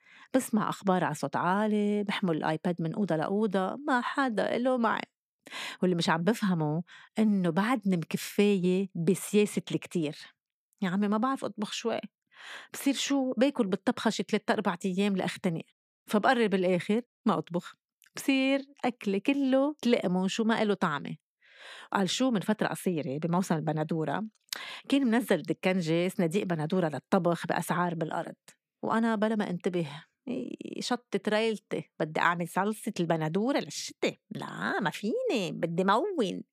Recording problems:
none

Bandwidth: 15 kHz